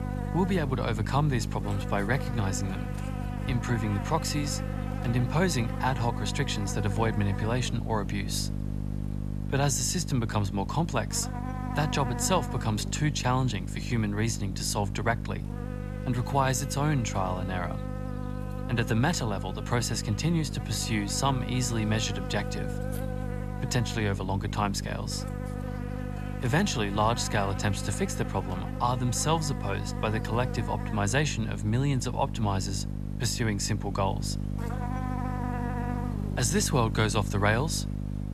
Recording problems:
electrical hum; loud; throughout; 50 Hz, 10 dB below the speech

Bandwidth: 13.5 kHz